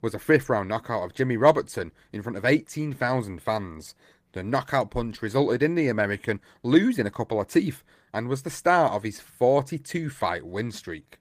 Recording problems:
garbled, watery; slightly; nothing above 15 kHz

